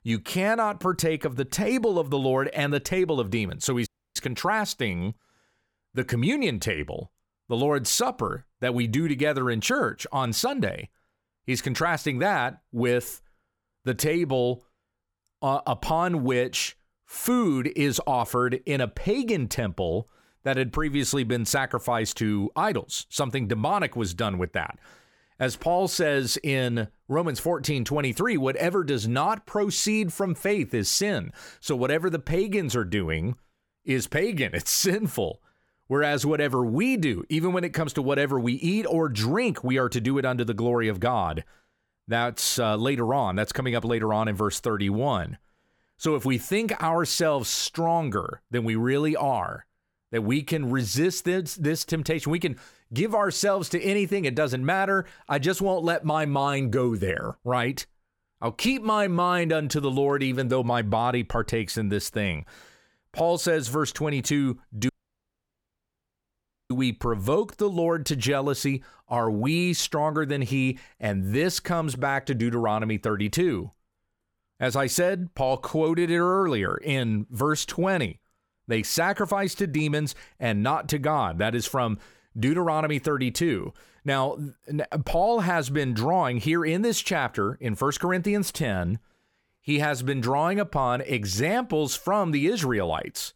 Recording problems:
audio cutting out; at 4 s and at 1:05 for 2 s

